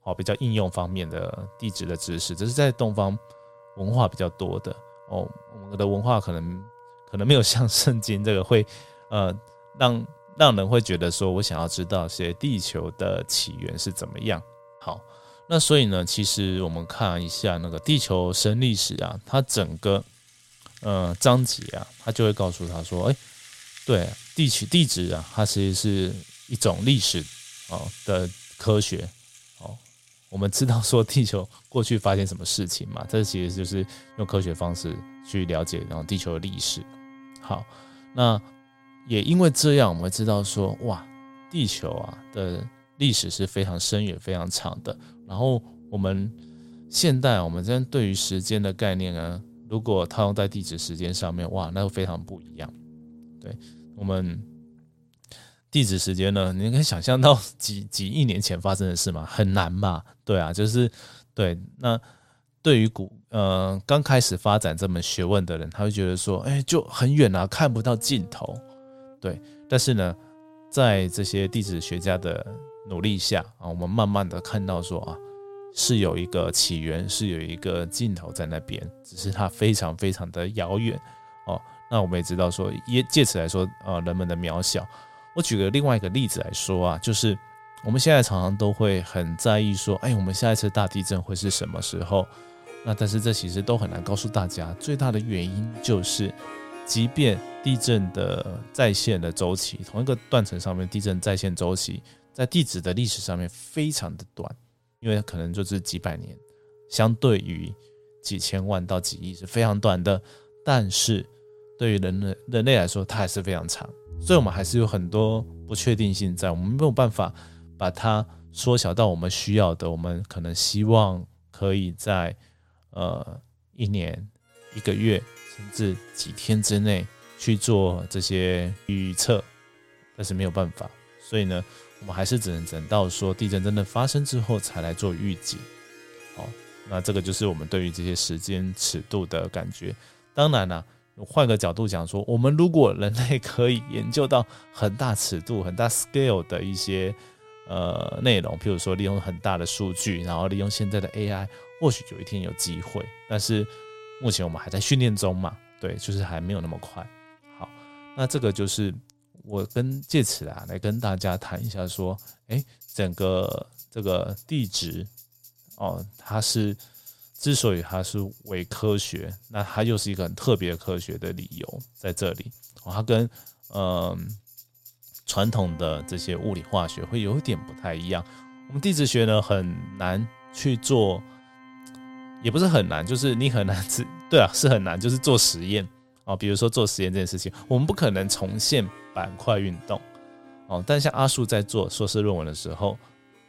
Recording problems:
background music; faint; throughout; 20 dB below the speech

